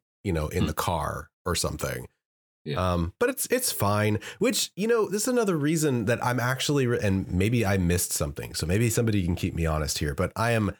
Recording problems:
none

